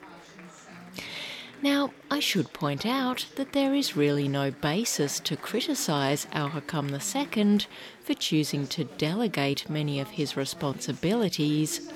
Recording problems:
chatter from many people; noticeable; throughout; 20 dB below the speech

